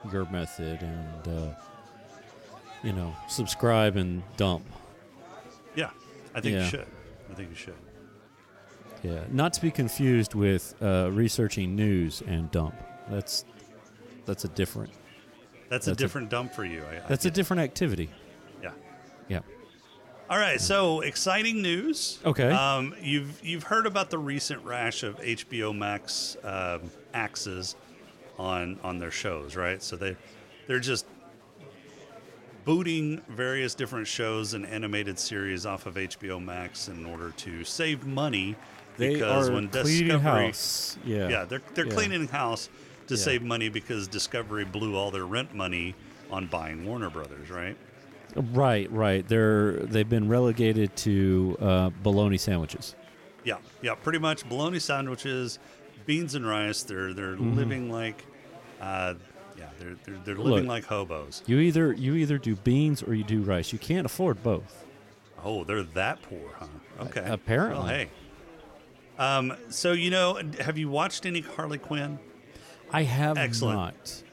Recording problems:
chatter from many people; faint; throughout; 20 dB below the speech

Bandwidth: 16.5 kHz